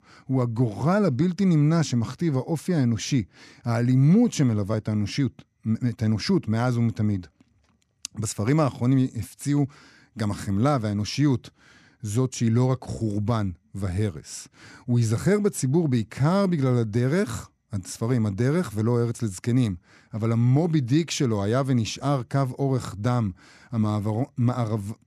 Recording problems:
none

